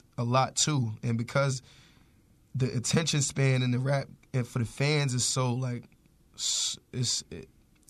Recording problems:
none

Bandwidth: 13.5 kHz